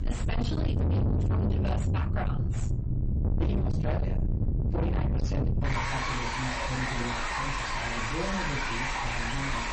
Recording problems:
distortion; heavy; 5 dB below the speech
off-mic speech; far
room echo; very slight; dies away in 0.2 s
garbled, watery; slightly; nothing above 8 kHz
rain or running water; very loud; throughout; 3 dB above the speech
electrical hum; noticeable; throughout; 60 Hz, 20 dB below the speech
uneven, jittery; slightly; from 1 to 7 s

